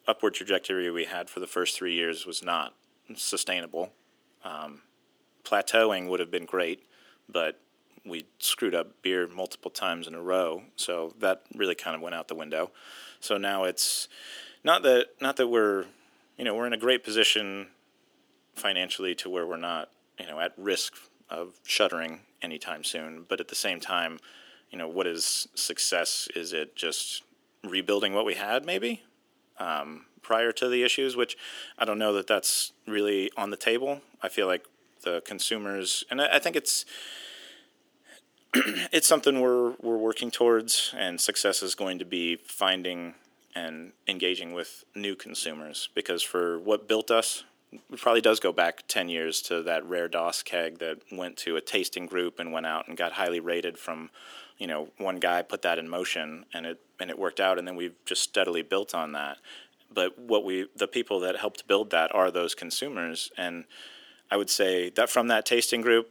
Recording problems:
thin; somewhat; fading below 300 Hz

